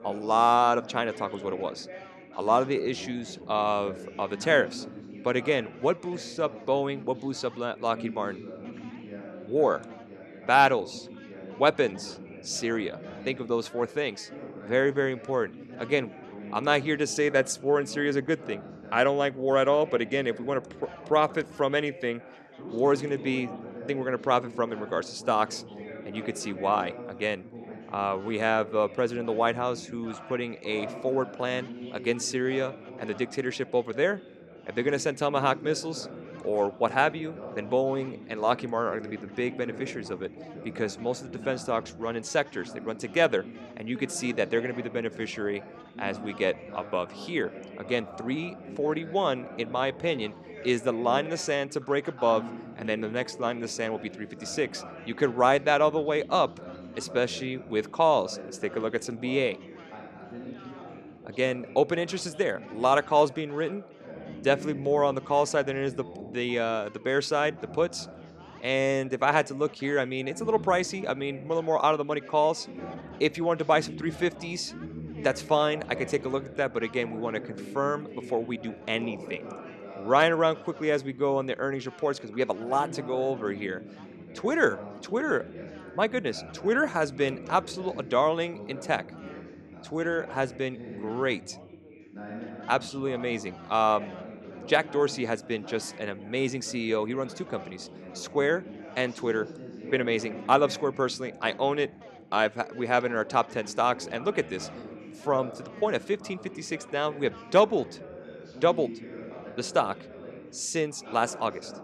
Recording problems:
background chatter; noticeable; throughout; 4 voices, 15 dB below the speech

